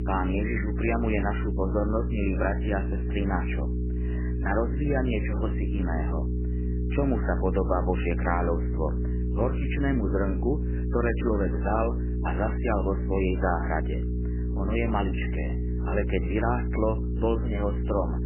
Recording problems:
garbled, watery; badly; nothing above 3 kHz
electrical hum; loud; throughout; 60 Hz, 9 dB below the speech

